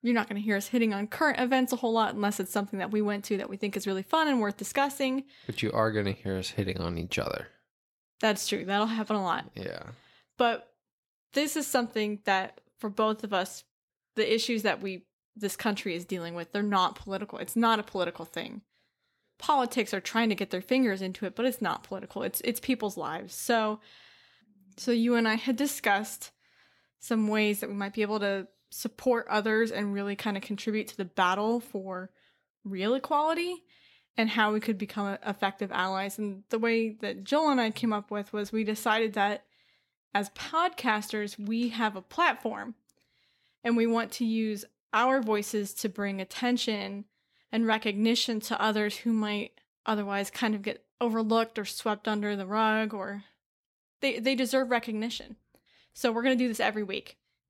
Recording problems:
none

